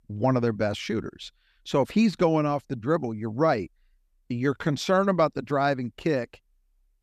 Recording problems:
none

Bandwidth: 14.5 kHz